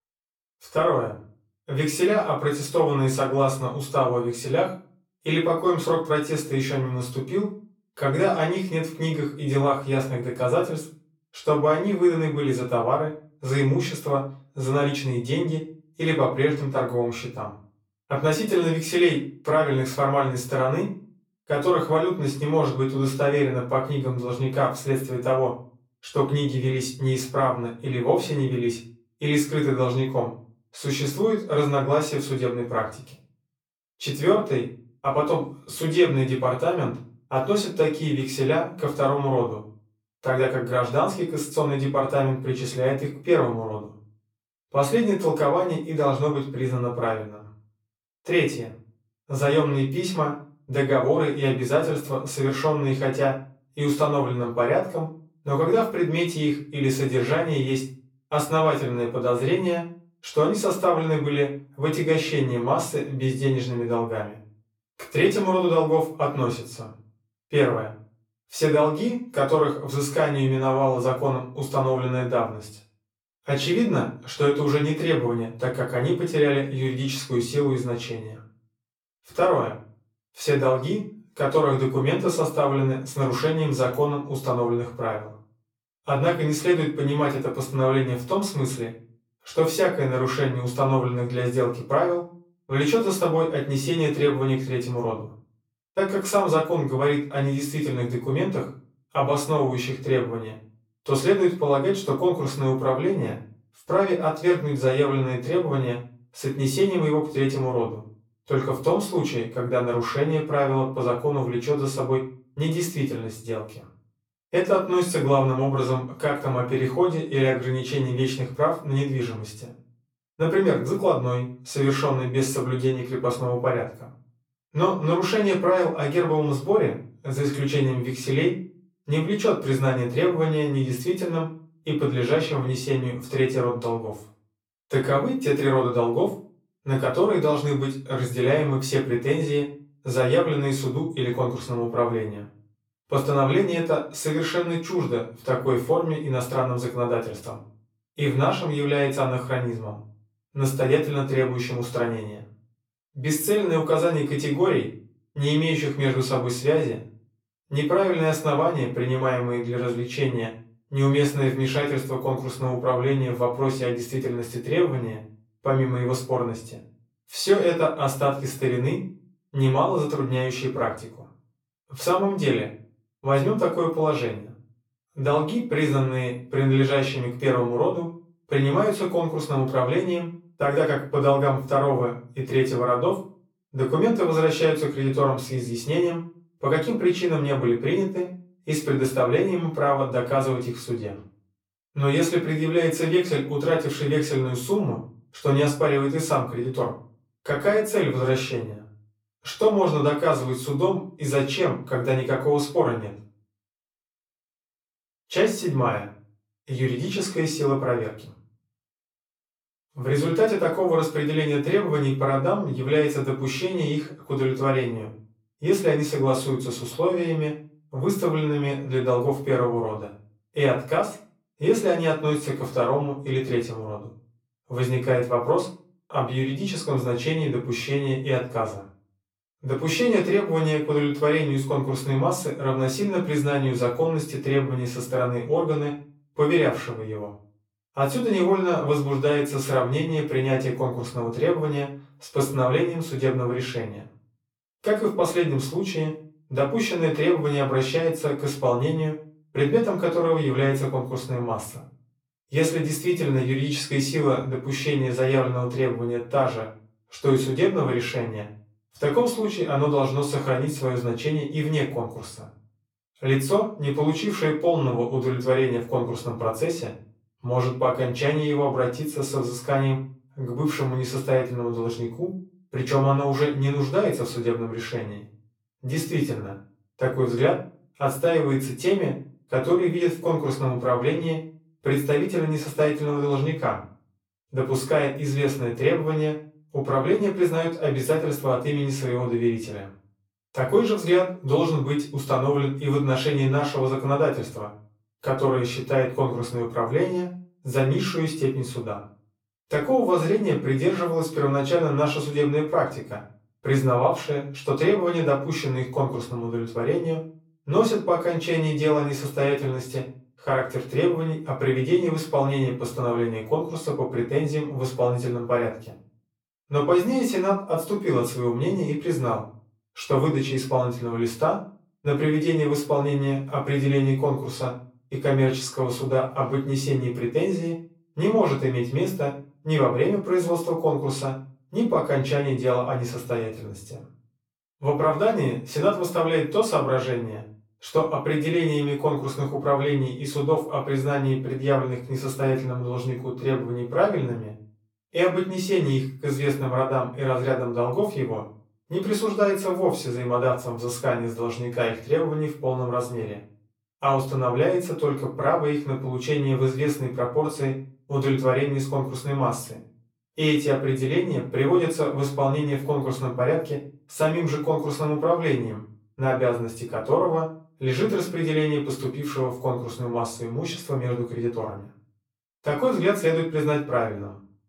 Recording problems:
off-mic speech; far
room echo; slight; dies away in 0.3 s

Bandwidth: 17.5 kHz